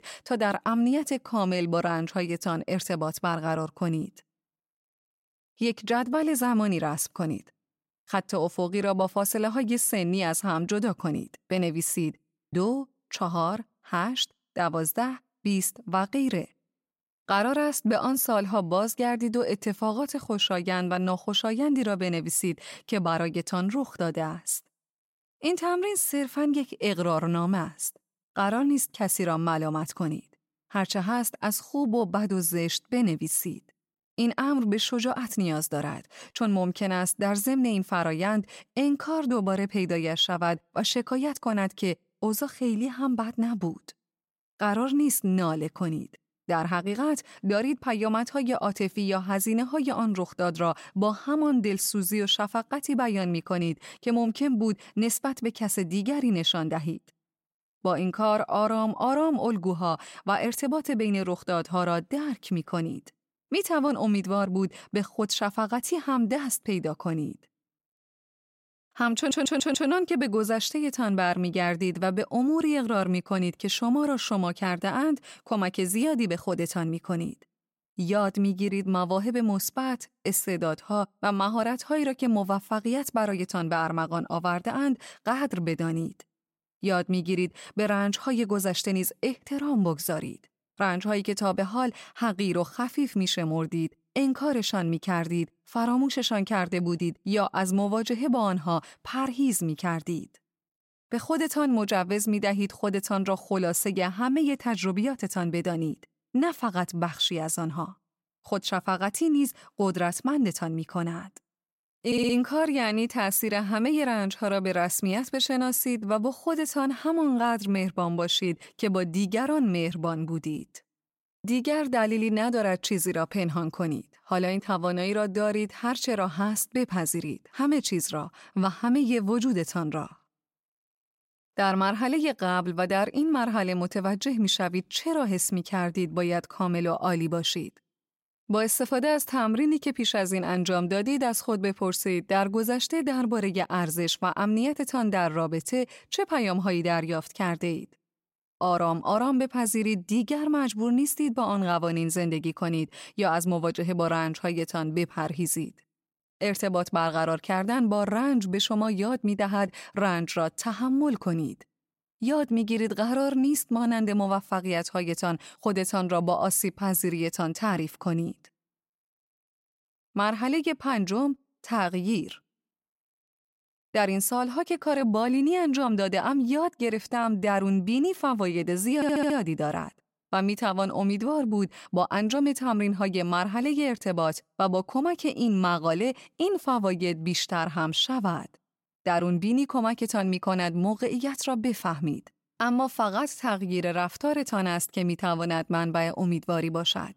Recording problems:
audio stuttering; at 1:09, at 1:52 and at 2:59

